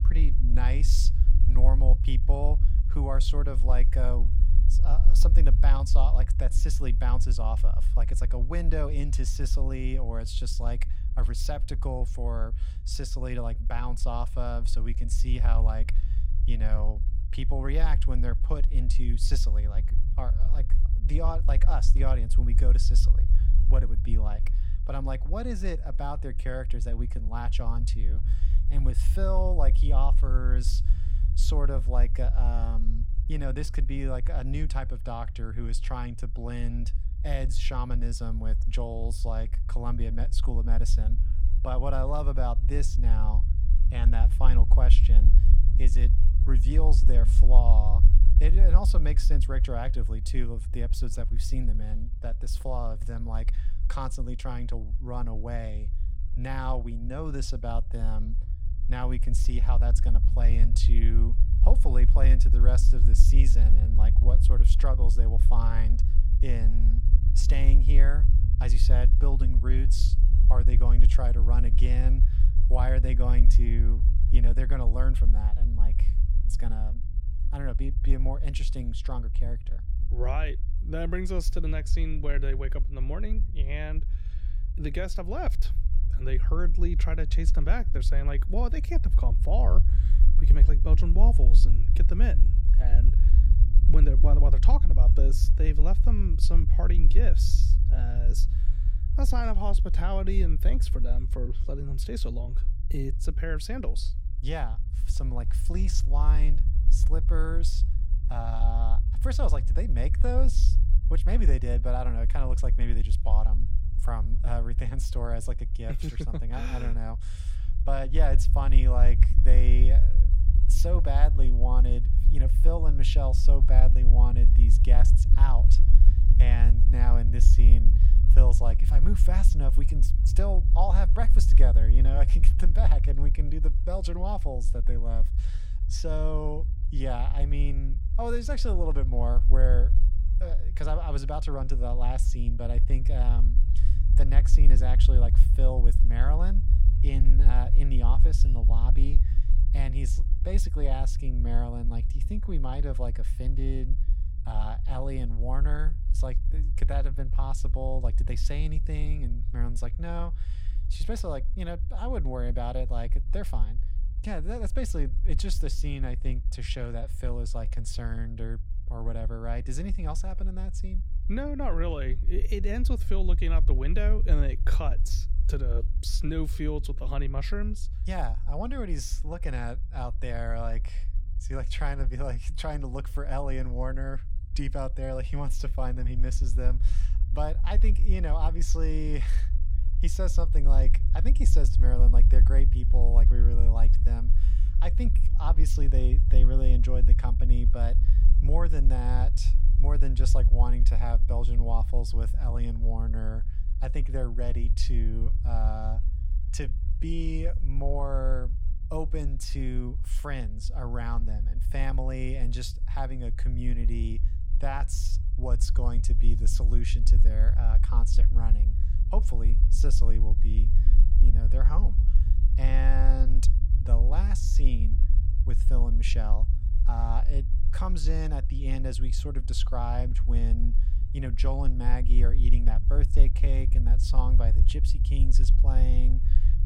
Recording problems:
low rumble; loud; throughout; 10 dB below the speech

